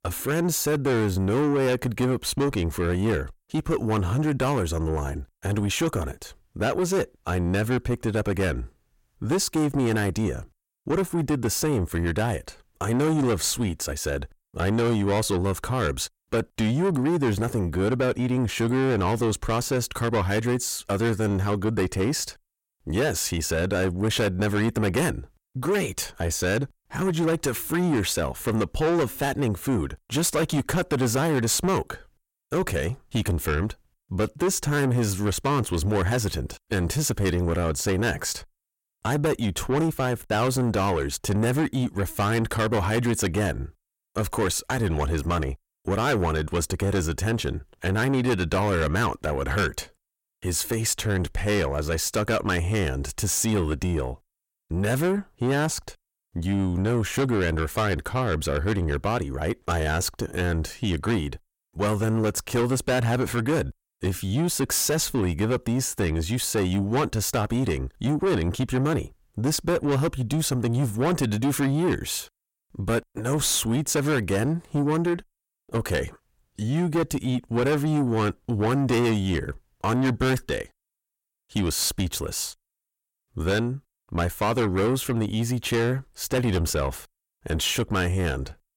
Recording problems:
distortion; heavy; 7 dB below the speech

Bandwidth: 16.5 kHz